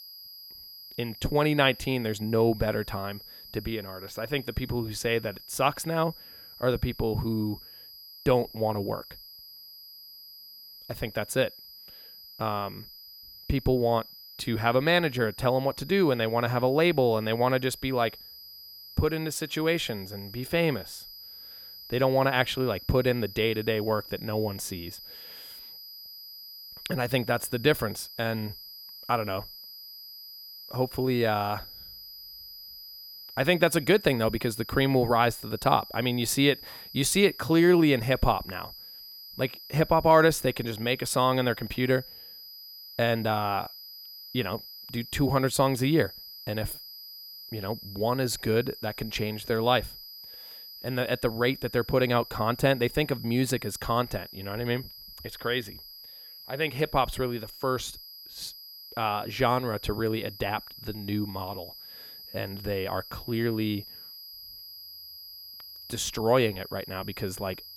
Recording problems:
high-pitched whine; noticeable; throughout; 5 kHz, 15 dB below the speech

